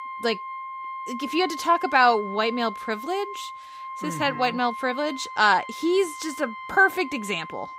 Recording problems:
background music; noticeable; throughout; 10 dB below the speech

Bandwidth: 15.5 kHz